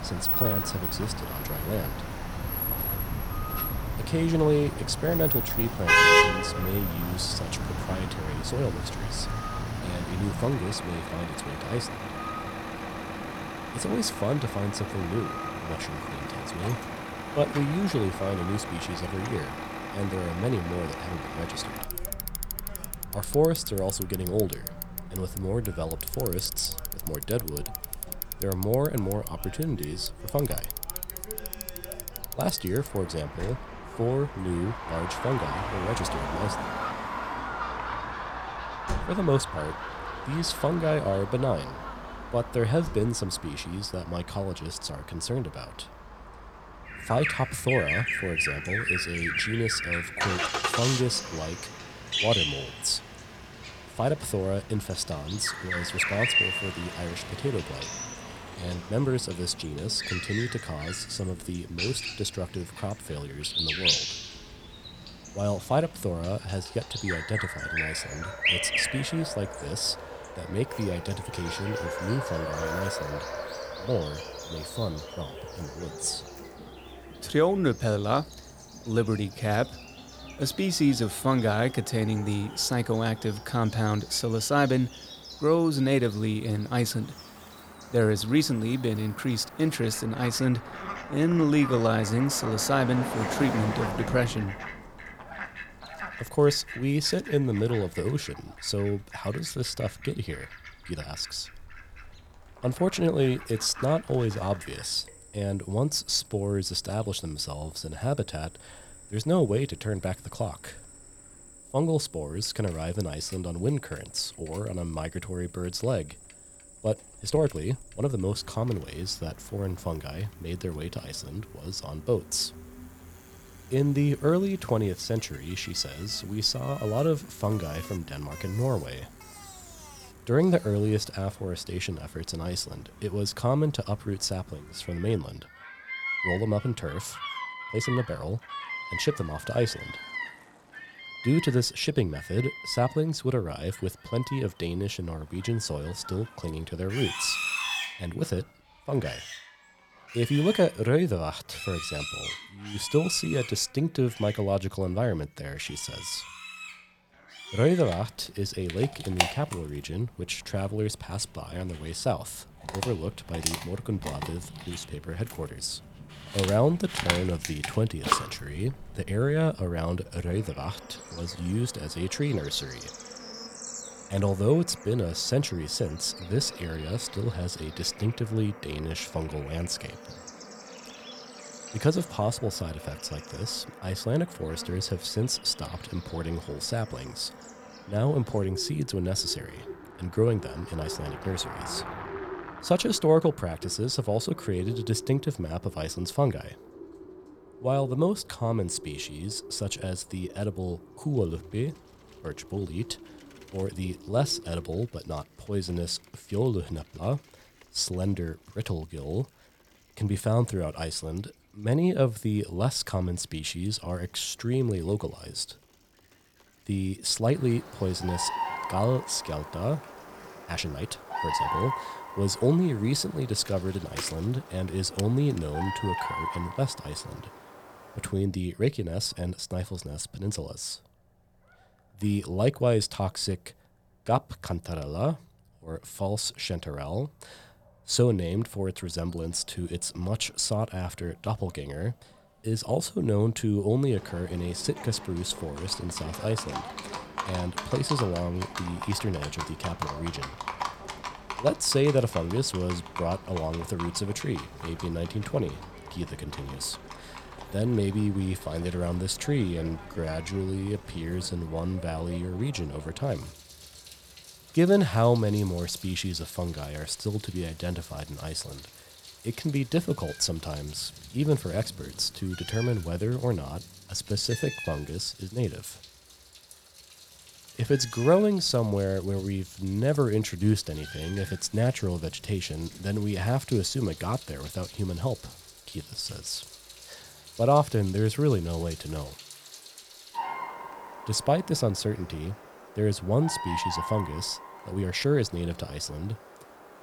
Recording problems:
animal sounds; loud; throughout; 9 dB below the speech
traffic noise; loud; throughout; 5 dB below the speech
uneven, jittery; strongly; from 9.5 s to 4:55

